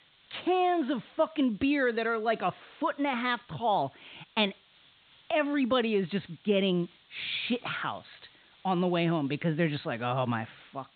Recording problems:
high frequencies cut off; severe; nothing above 4 kHz
hiss; faint; throughout; 30 dB below the speech

